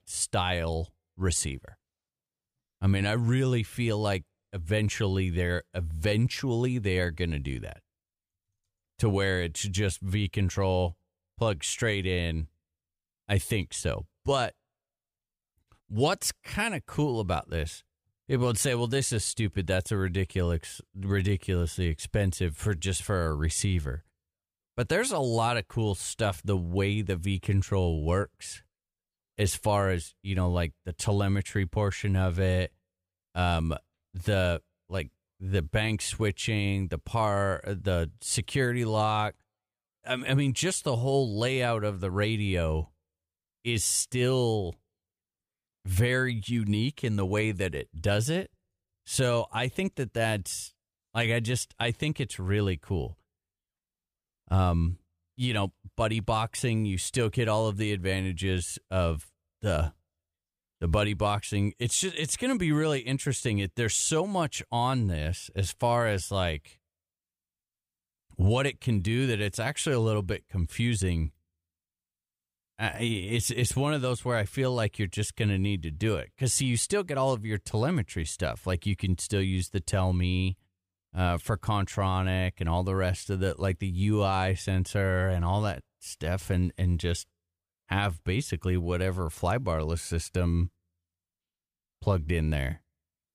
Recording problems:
none

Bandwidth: 15 kHz